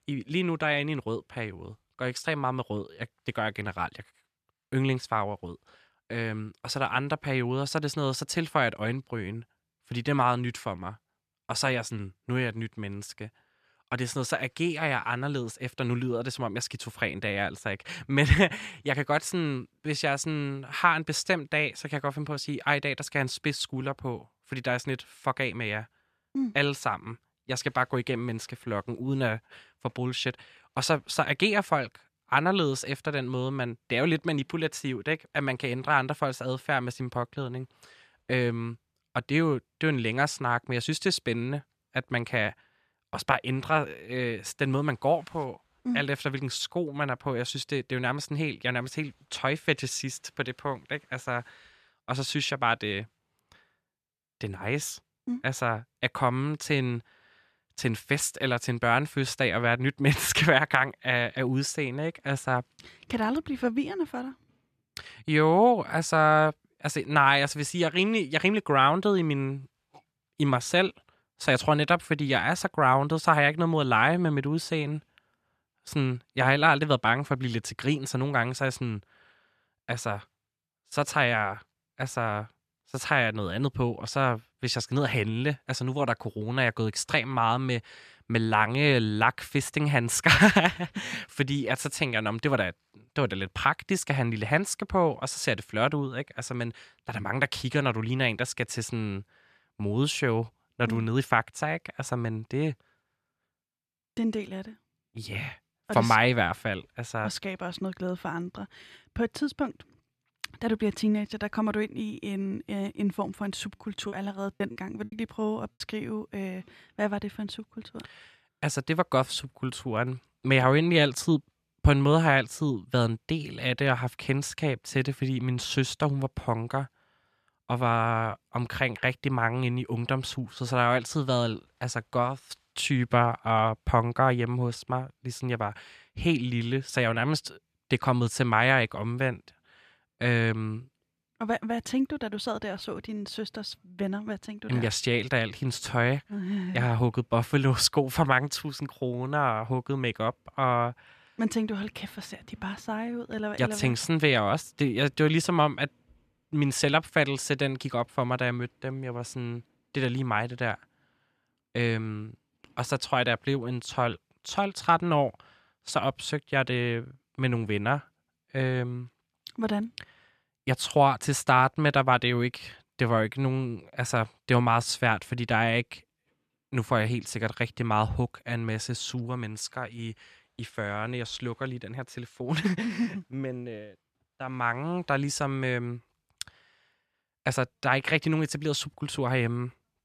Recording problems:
choppy; very; from 1:54 to 1:56; 11% of the speech affected

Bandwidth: 14.5 kHz